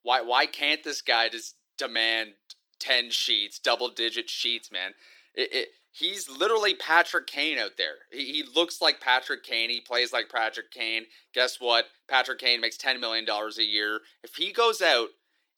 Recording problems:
thin; very; fading below 350 Hz

